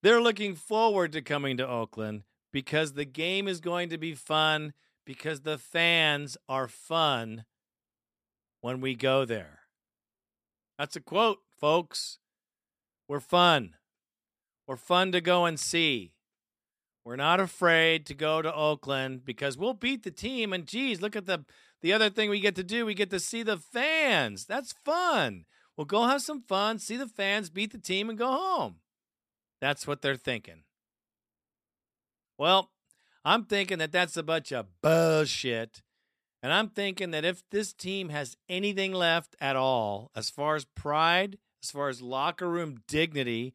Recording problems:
none

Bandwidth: 14.5 kHz